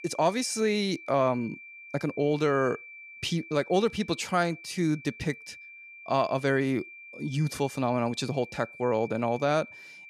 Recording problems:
high-pitched whine; noticeable; throughout; 2.5 kHz, 15 dB below the speech

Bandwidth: 14.5 kHz